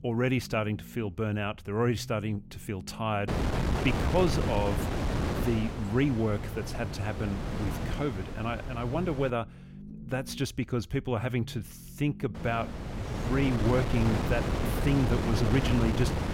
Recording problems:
wind noise on the microphone; heavy; from 3.5 to 9.5 s and from 12 s on; 3 dB below the speech
low rumble; faint; throughout; 20 dB below the speech

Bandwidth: 16 kHz